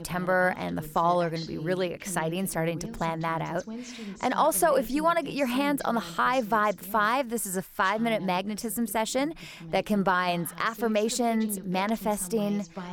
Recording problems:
voice in the background; noticeable; throughout; 15 dB below the speech

